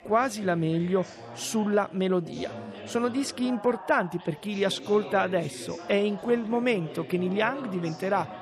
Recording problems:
background chatter; noticeable; throughout; 4 voices, 15 dB below the speech

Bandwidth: 13.5 kHz